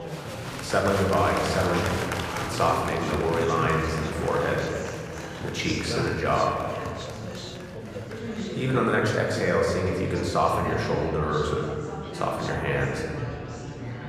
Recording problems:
room echo; noticeable; dies away in 1.9 s
off-mic speech; somewhat distant
chatter from many people; loud; throughout; 7 dB below the speech
background music; faint; until 3.5 s; 25 dB below the speech

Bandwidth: 14.5 kHz